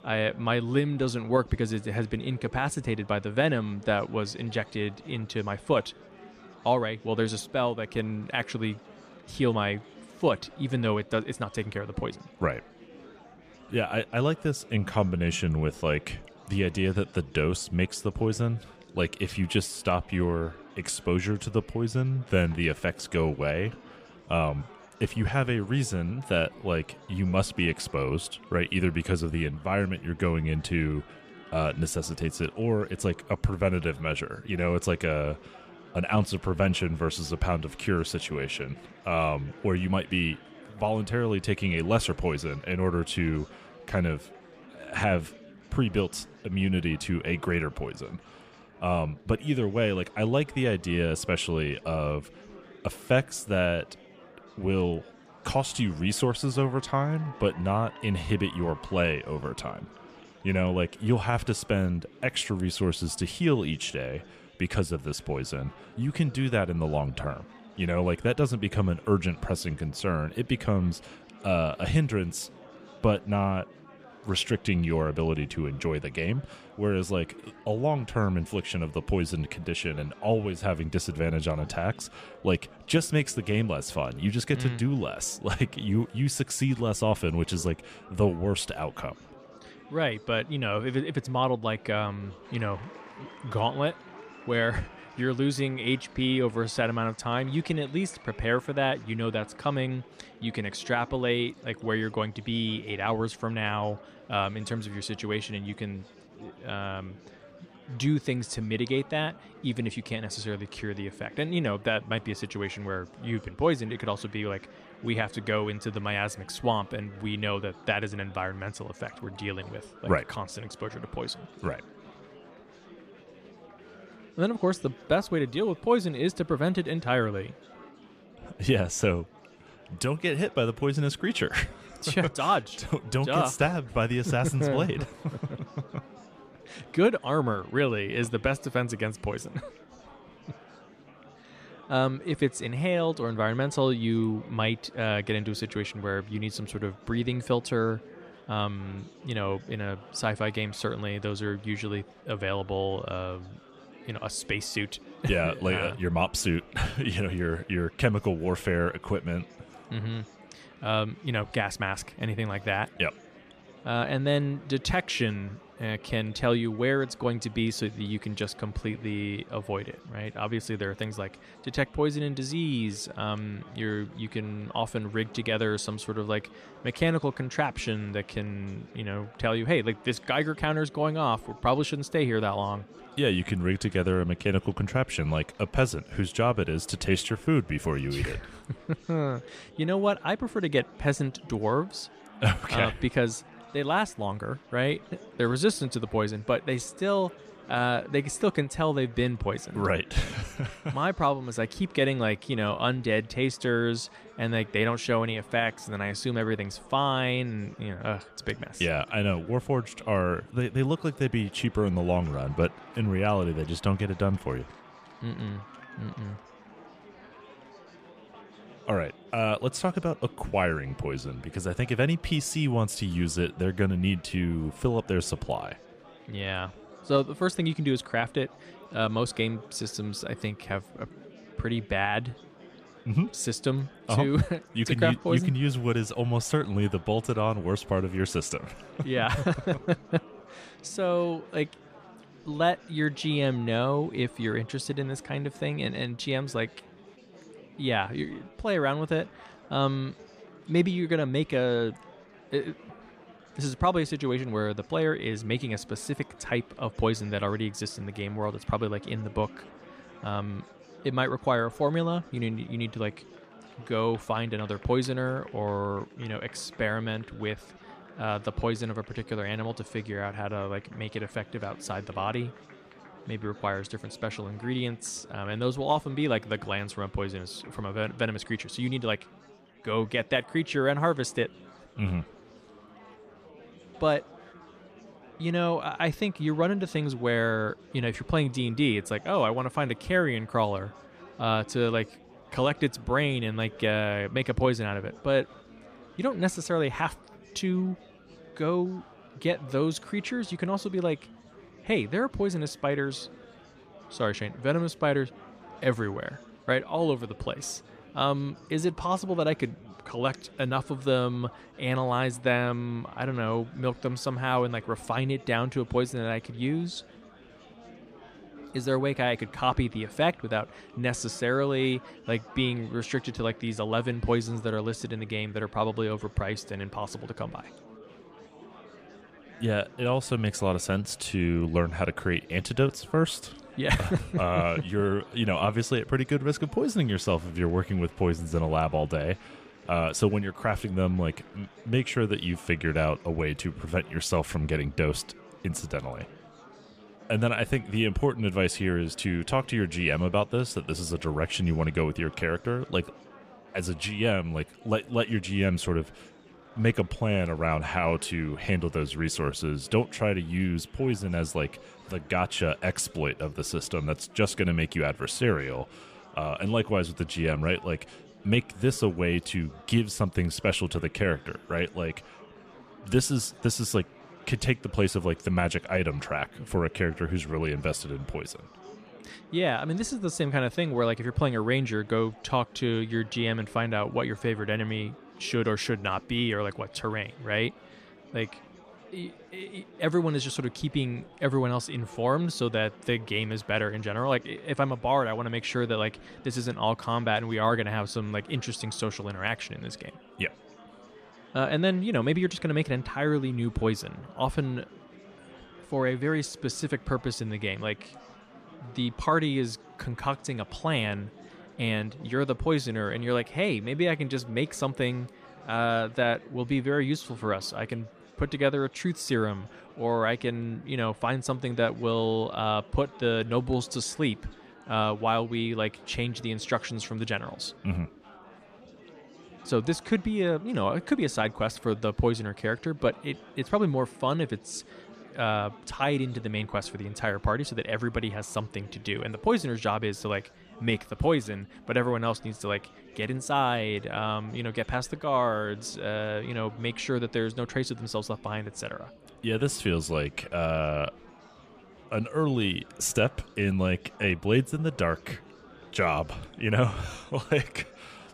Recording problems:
murmuring crowd; faint; throughout; 20 dB below the speech

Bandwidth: 15 kHz